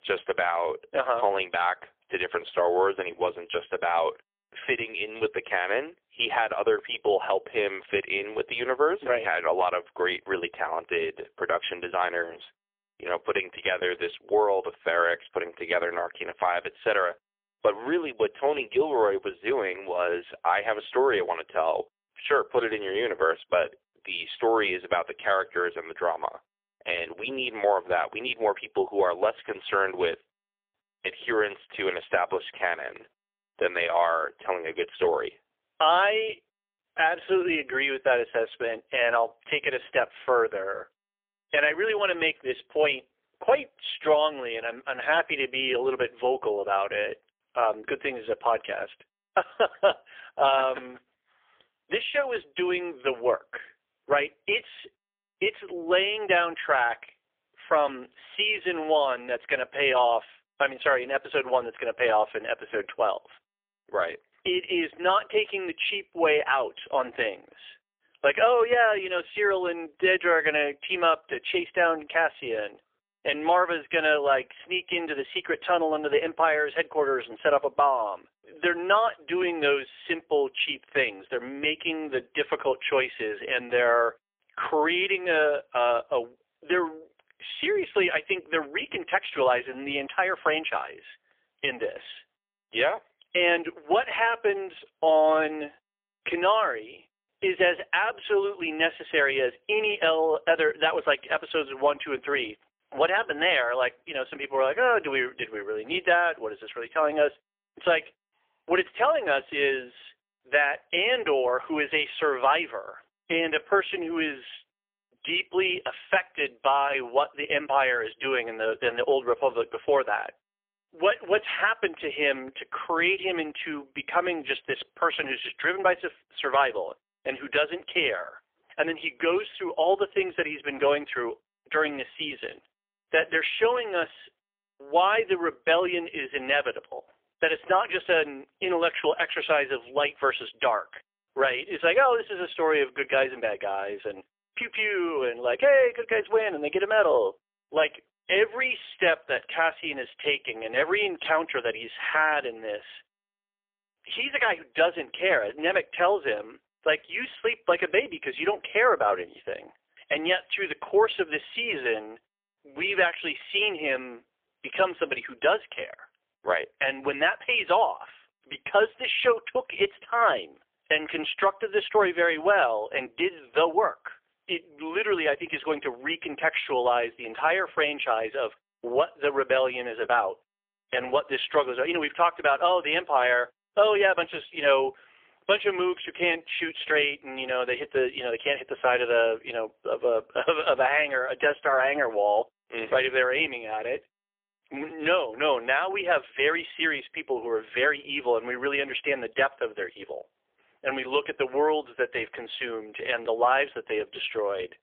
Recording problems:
phone-call audio; poor line; nothing above 3.5 kHz

